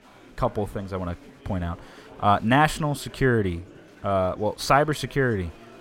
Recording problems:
murmuring crowd; faint; throughout; 25 dB below the speech

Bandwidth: 16 kHz